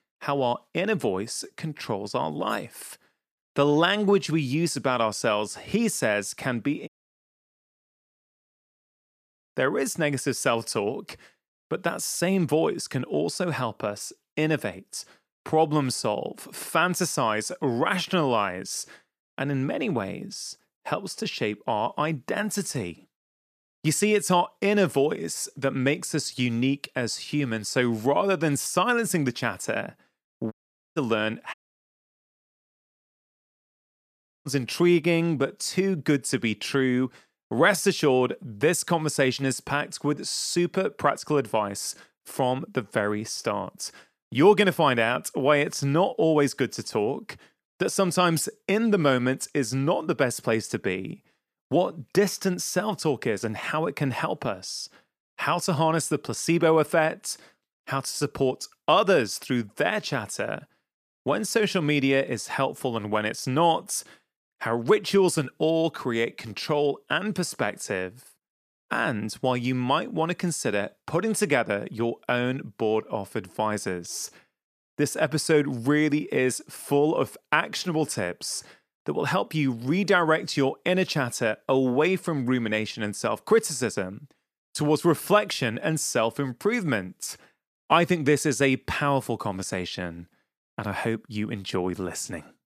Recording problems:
audio cutting out; at 7 s for 2.5 s, at 31 s and at 32 s for 3 s

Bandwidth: 14.5 kHz